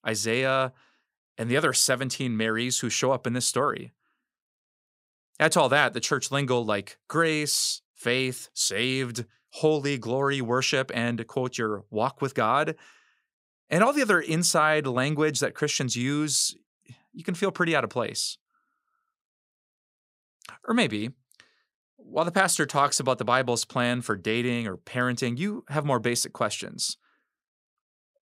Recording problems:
none

